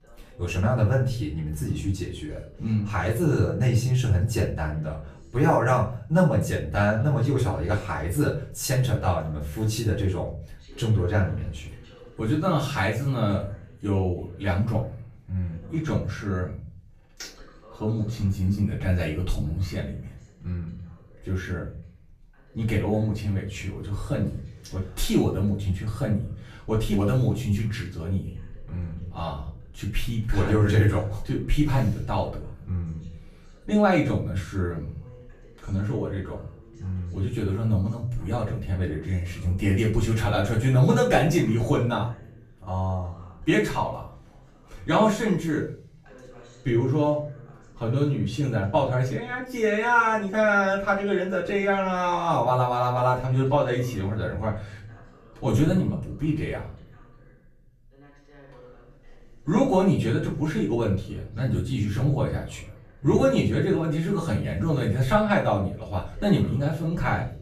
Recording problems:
off-mic speech; far
room echo; slight; dies away in 0.4 s
voice in the background; faint; throughout; 25 dB below the speech

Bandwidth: 14.5 kHz